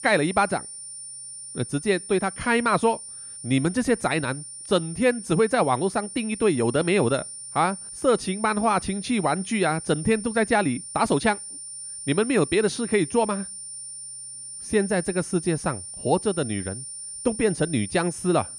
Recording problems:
high-pitched whine; noticeable; throughout; 9 kHz, 10 dB below the speech

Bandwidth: 14.5 kHz